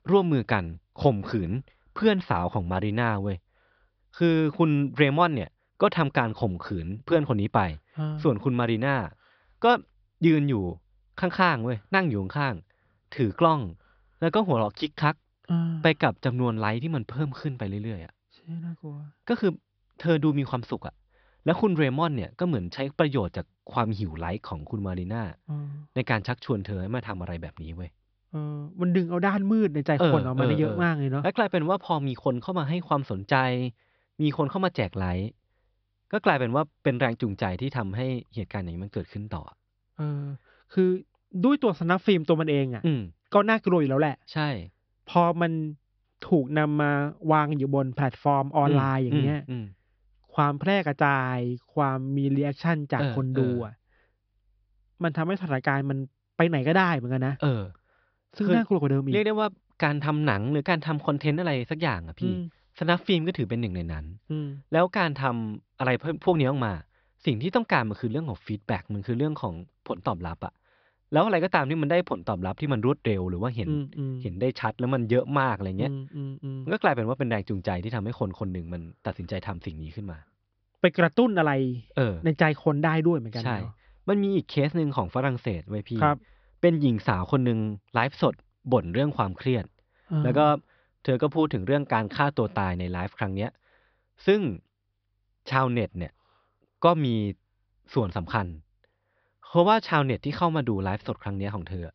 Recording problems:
high frequencies cut off; noticeable; nothing above 5.5 kHz

